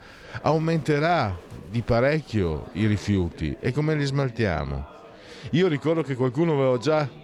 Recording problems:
murmuring crowd; faint; throughout; 20 dB below the speech

